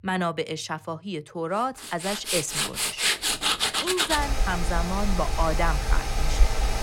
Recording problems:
machinery noise; very loud; from 2 s on; 4 dB above the speech

